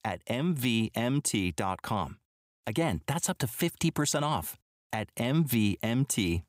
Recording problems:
none

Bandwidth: 15.5 kHz